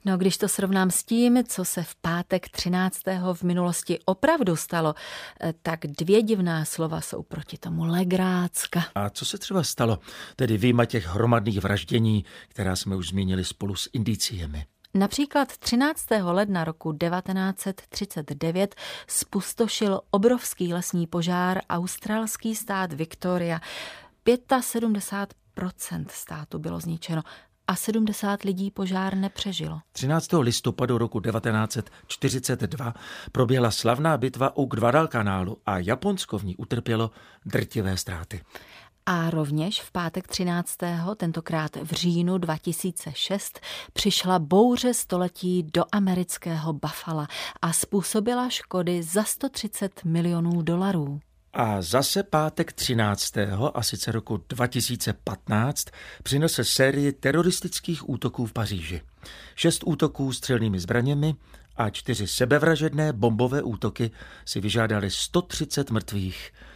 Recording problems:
none

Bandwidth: 15 kHz